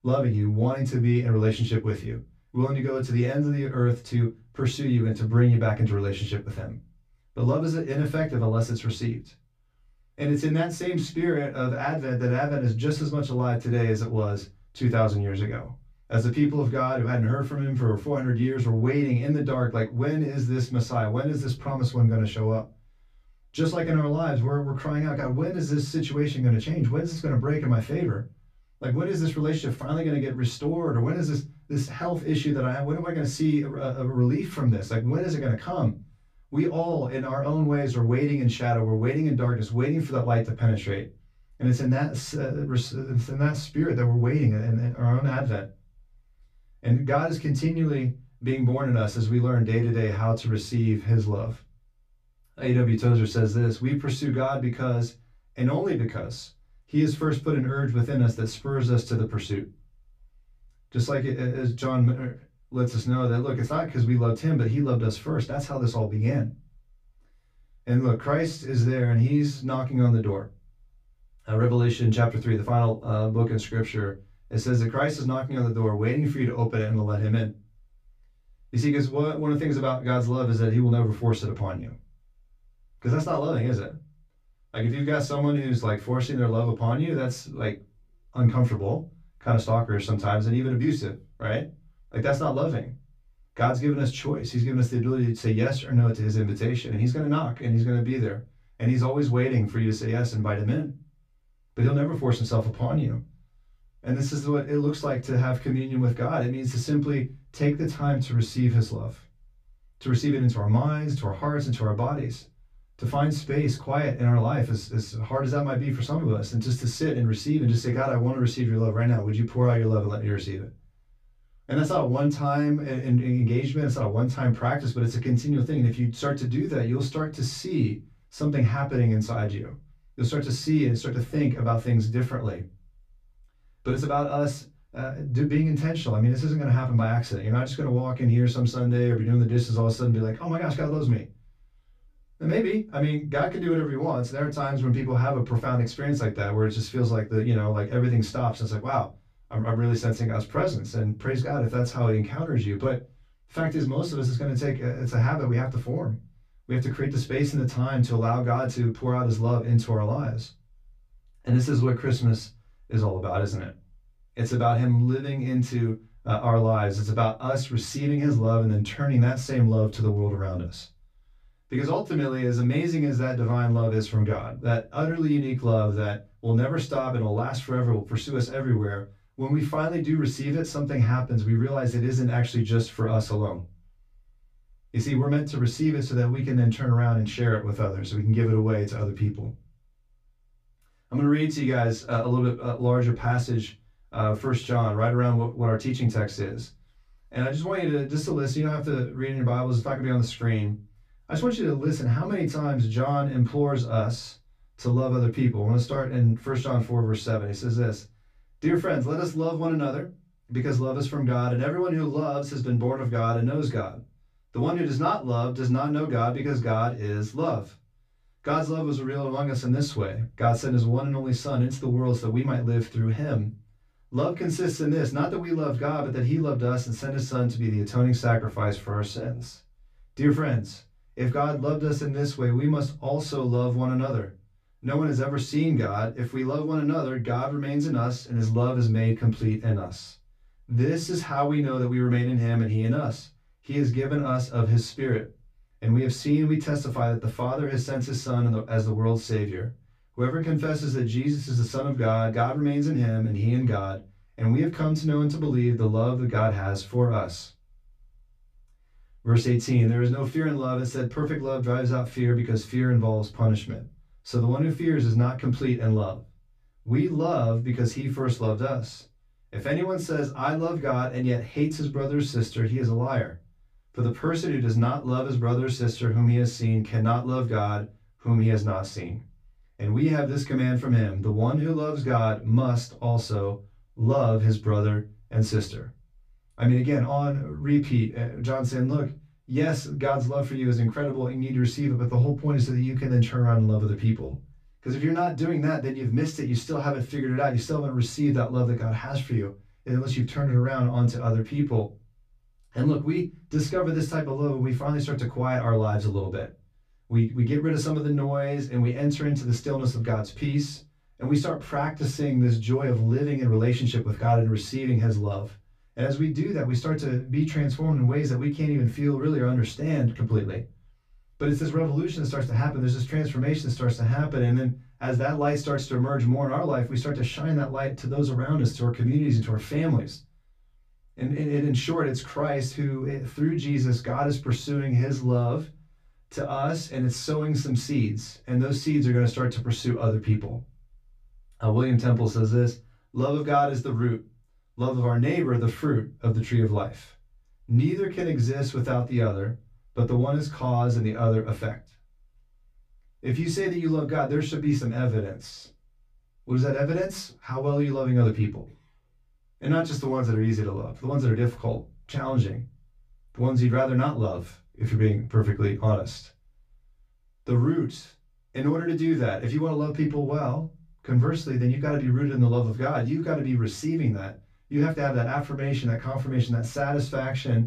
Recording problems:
off-mic speech; far
room echo; very slight; dies away in 0.2 s

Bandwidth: 14.5 kHz